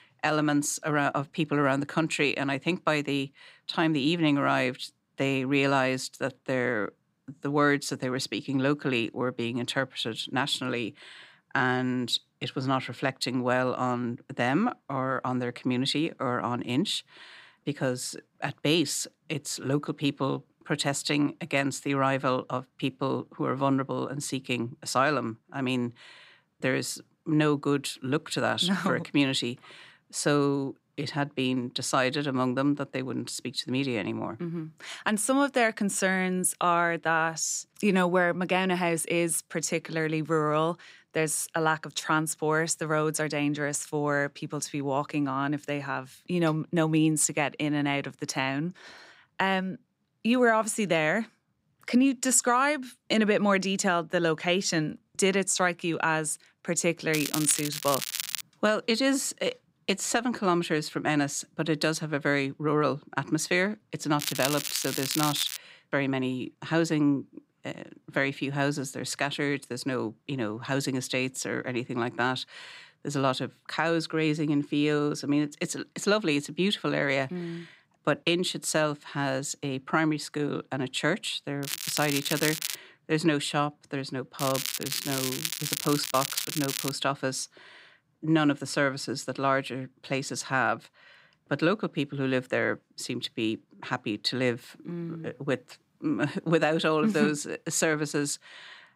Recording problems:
crackling; loud; 4 times, first at 57 s; 4 dB below the speech

